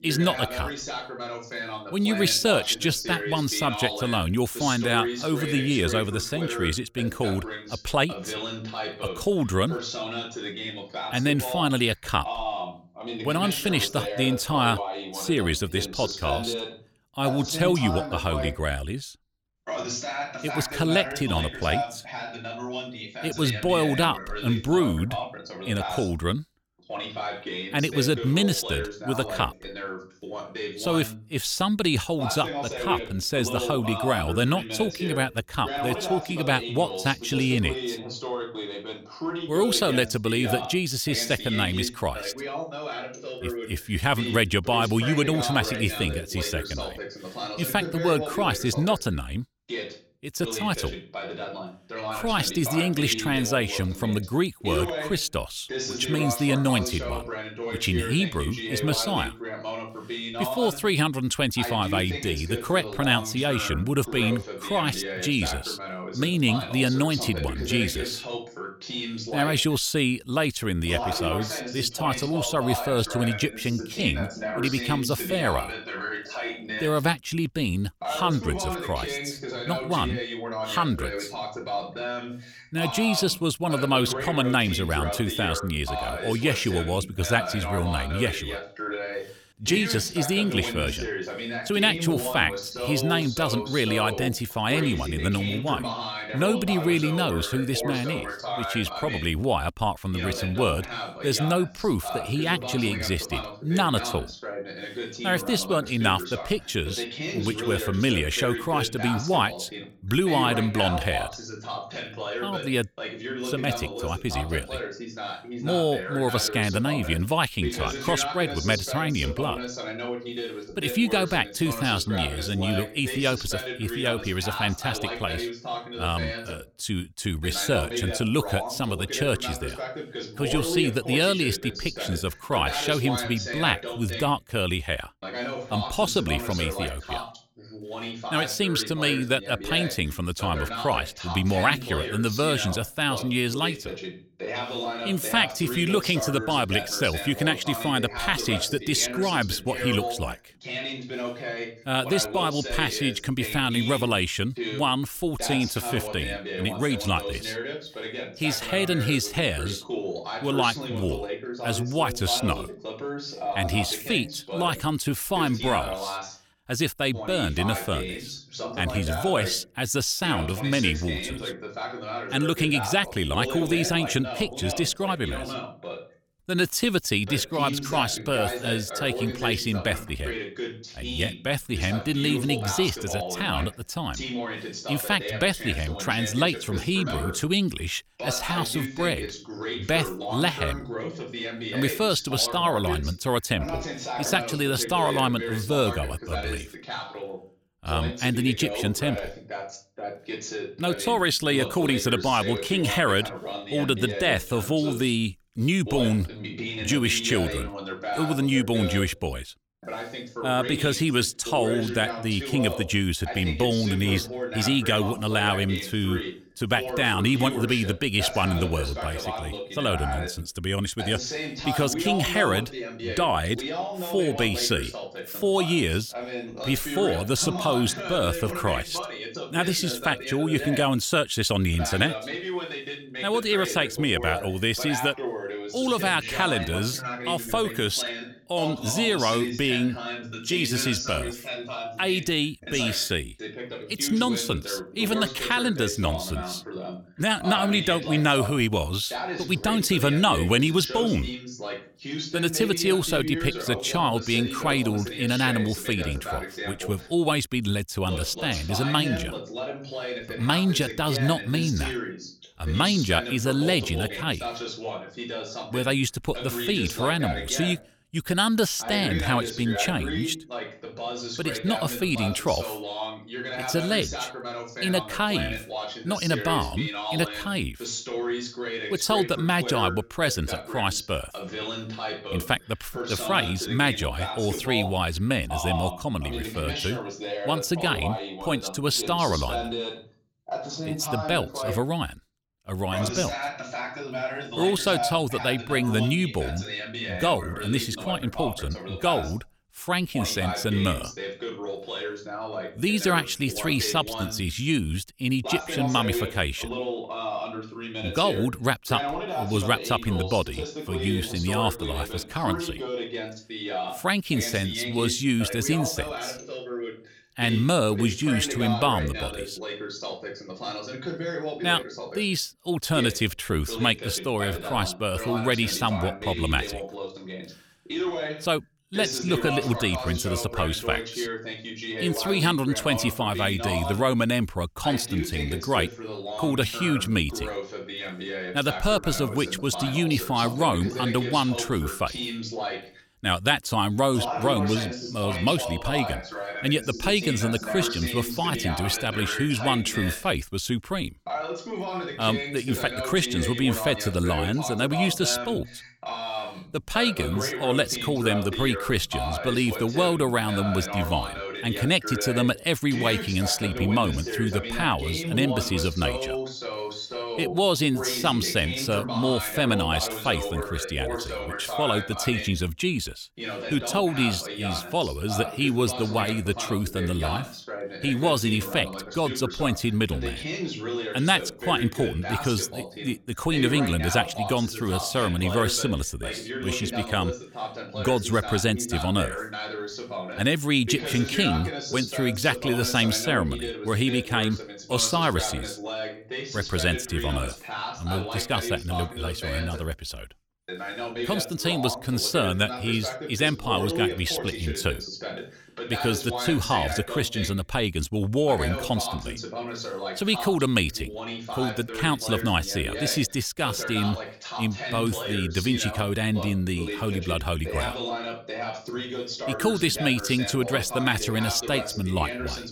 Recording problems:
voice in the background; loud; throughout; 7 dB below the speech

